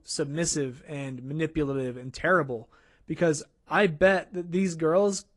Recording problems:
garbled, watery; slightly

